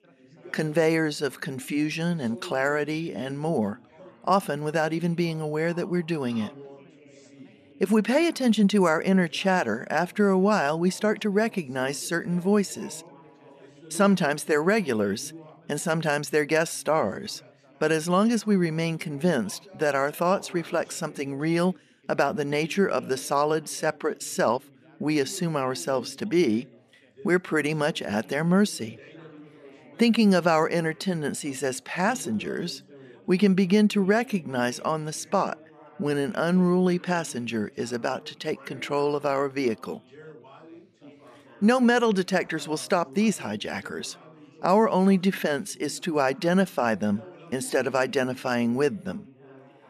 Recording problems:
background chatter; faint; throughout; 4 voices, 25 dB below the speech

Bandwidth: 14 kHz